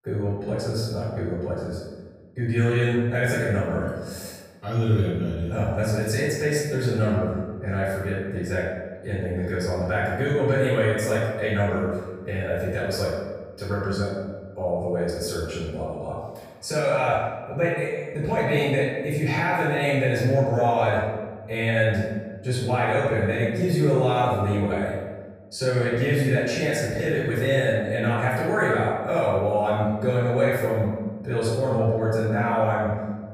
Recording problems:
room echo; strong; dies away in 1.2 s
off-mic speech; far

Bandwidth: 15 kHz